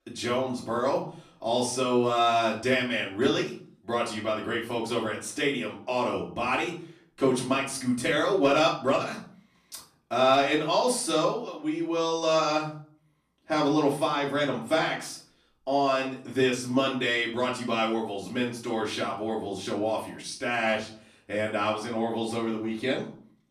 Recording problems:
off-mic speech; far
room echo; slight; dies away in 0.4 s

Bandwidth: 14.5 kHz